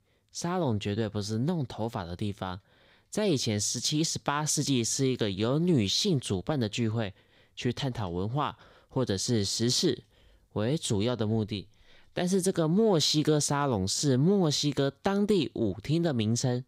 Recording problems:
none

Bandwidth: 15.5 kHz